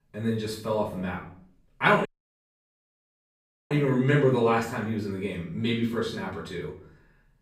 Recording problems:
off-mic speech; far
room echo; noticeable; dies away in 0.5 s
audio cutting out; at 2 s for 1.5 s

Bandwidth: 15.5 kHz